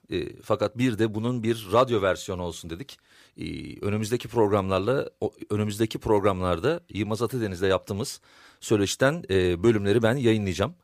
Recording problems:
none

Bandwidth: 15 kHz